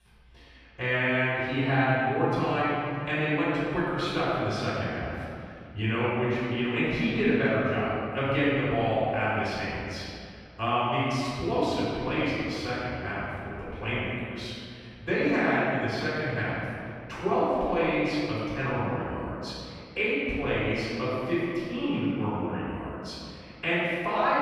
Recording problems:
room echo; strong; dies away in 2.1 s
off-mic speech; far

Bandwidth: 14.5 kHz